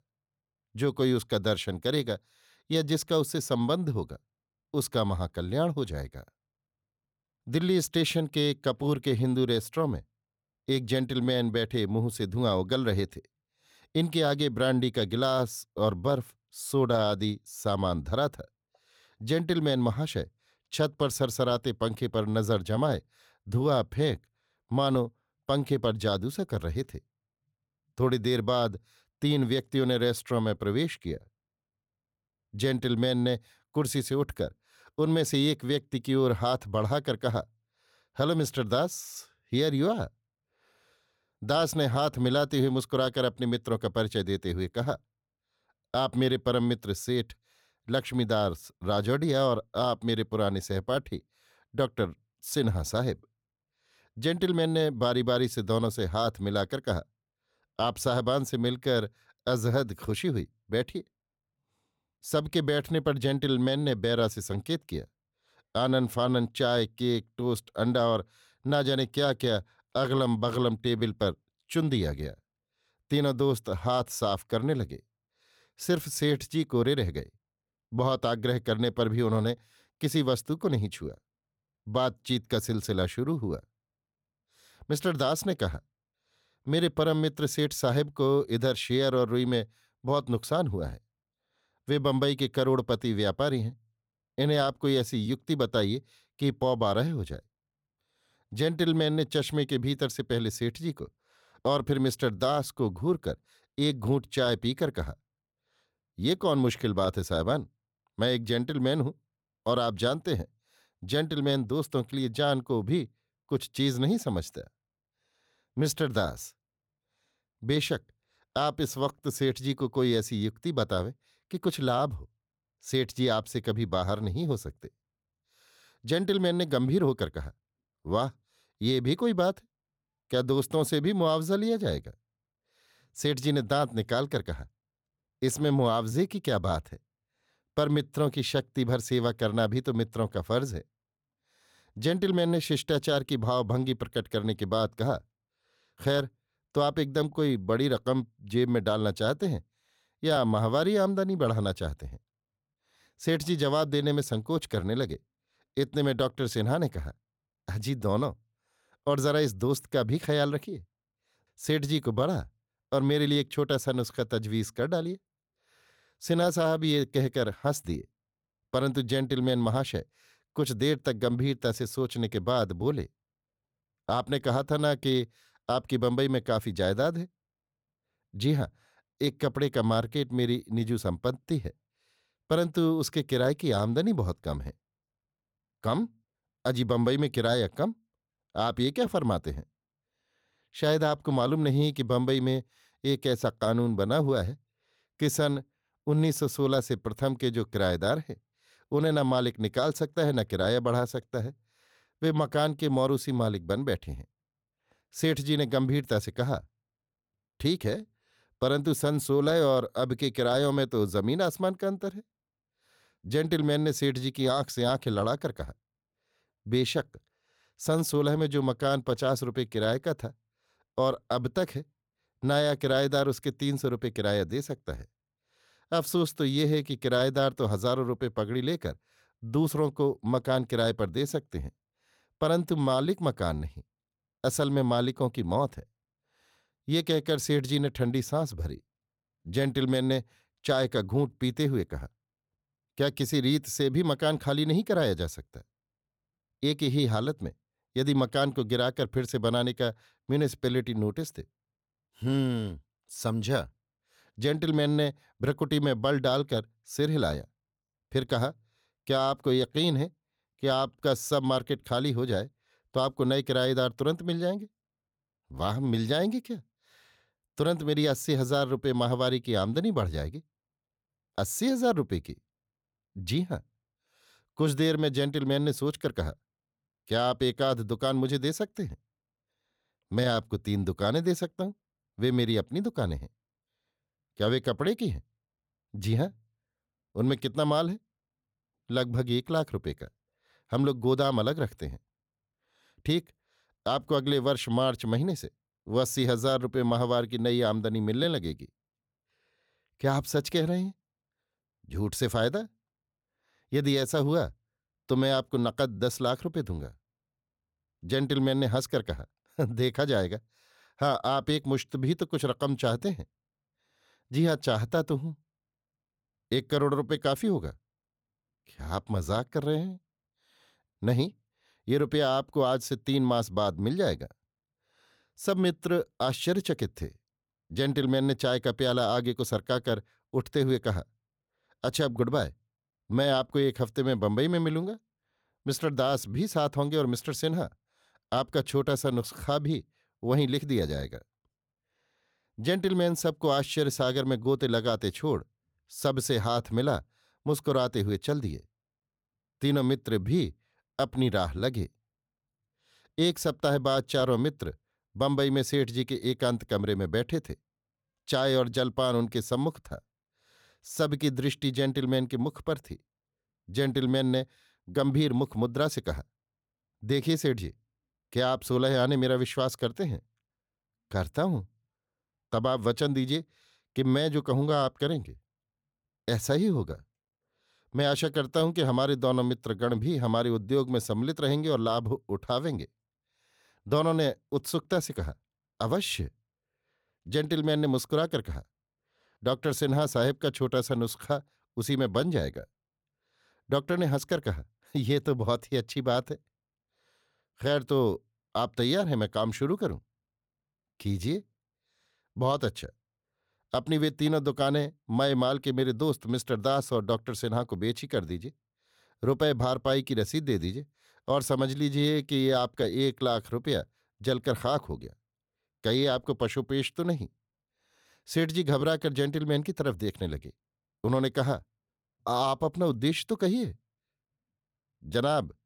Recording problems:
none

